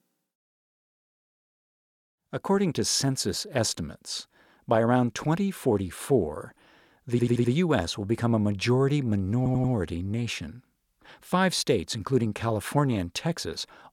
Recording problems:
audio stuttering; at 7 s and at 9.5 s

